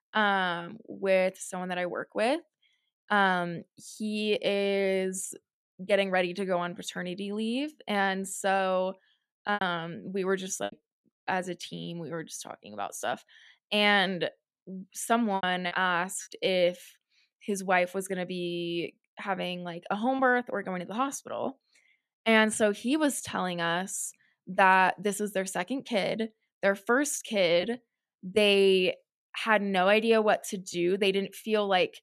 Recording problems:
choppy; occasionally; 2% of the speech affected

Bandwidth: 14.5 kHz